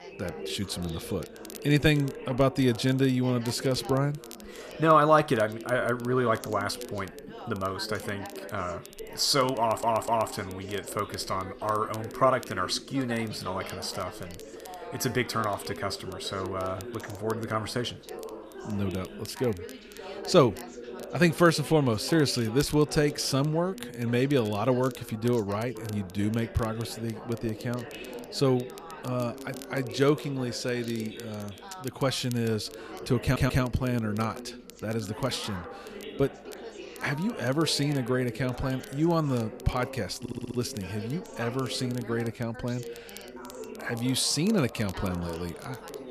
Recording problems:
background chatter; noticeable; throughout; 3 voices, 15 dB below the speech
crackle, like an old record; faint; 25 dB below the speech
audio stuttering; at 9.5 s, at 33 s and at 40 s

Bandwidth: 14.5 kHz